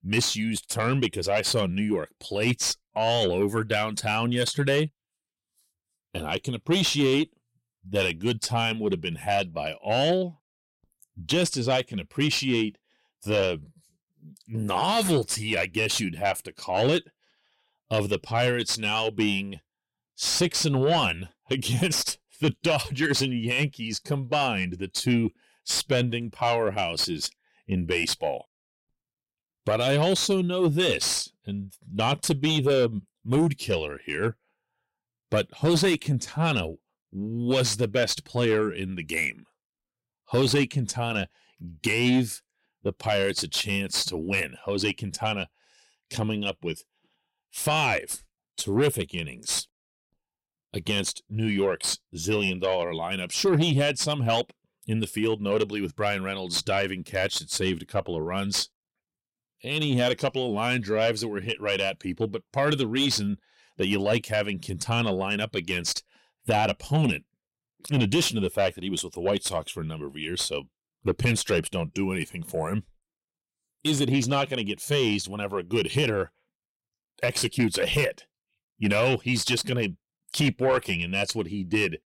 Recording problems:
distortion; slight; 10 dB below the speech

